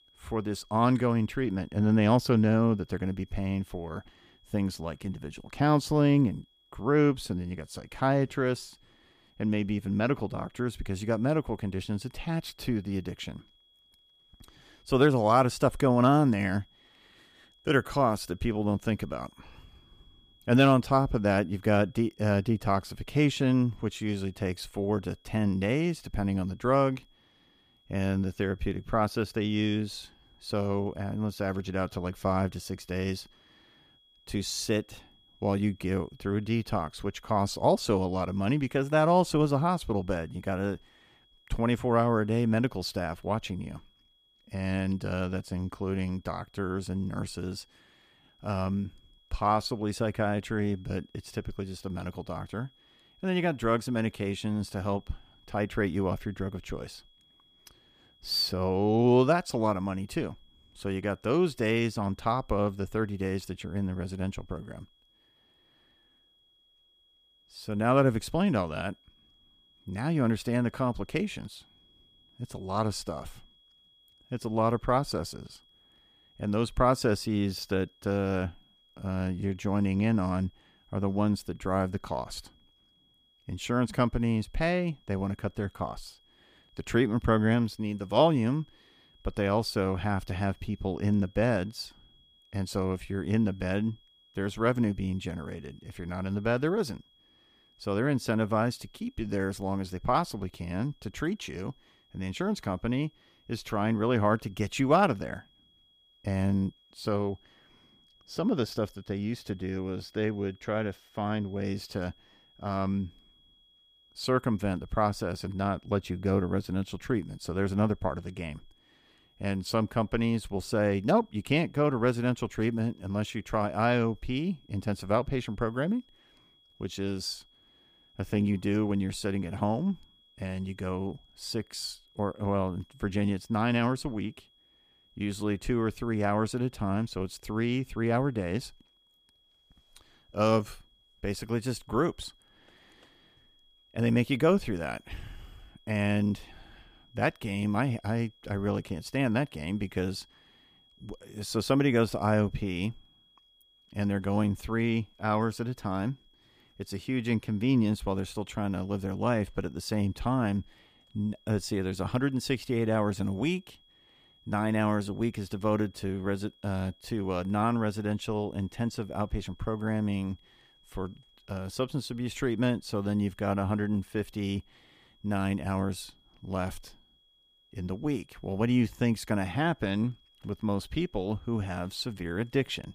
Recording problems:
high-pitched whine; faint; throughout; 3.5 kHz, 30 dB below the speech

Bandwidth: 15 kHz